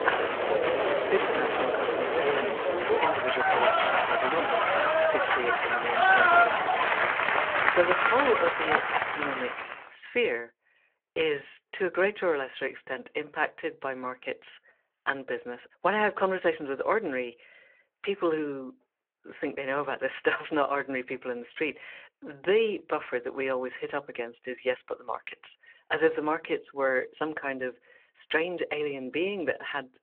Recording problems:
phone-call audio
crowd noise; very loud; until 9.5 s; 6 dB above the speech

